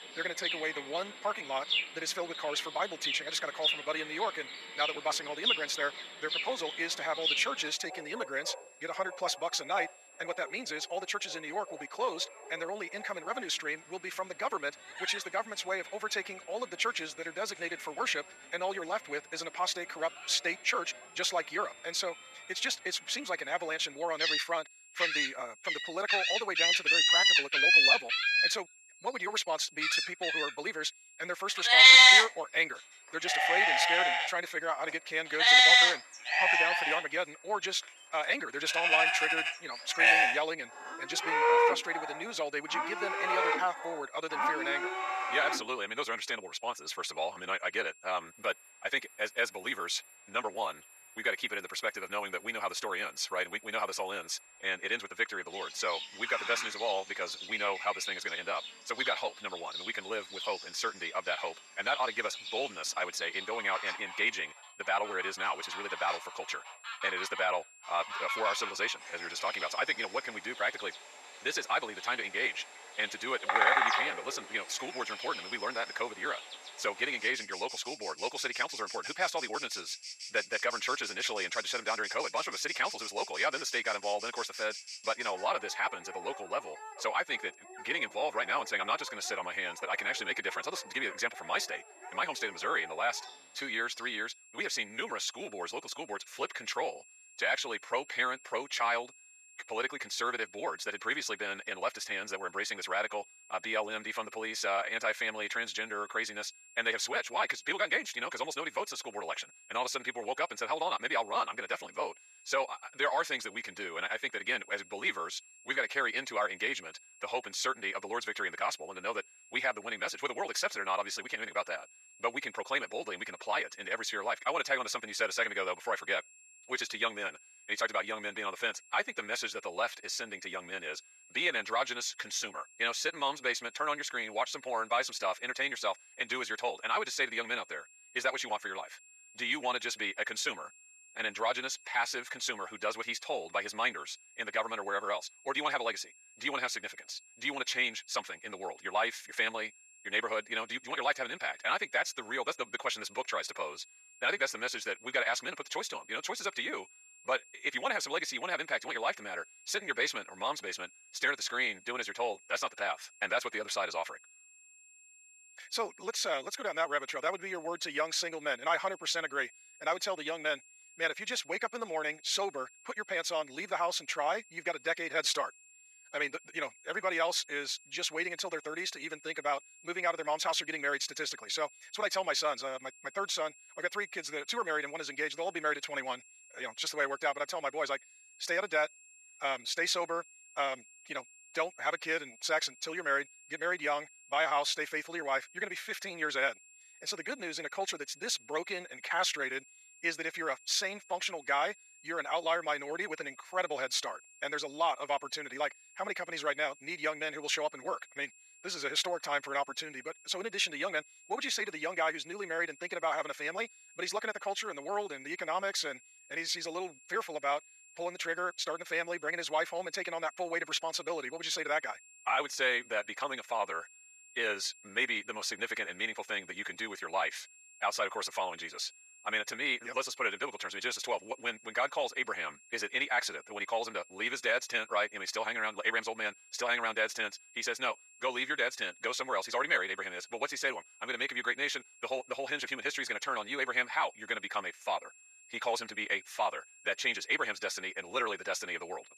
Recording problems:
thin; very; fading below 650 Hz
wrong speed, natural pitch; too fast; 1.5 times normal speed
animal sounds; very loud; until 1:34; 9 dB above the speech
high-pitched whine; faint; throughout; 2.5 kHz, 20 dB below the speech

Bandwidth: 14.5 kHz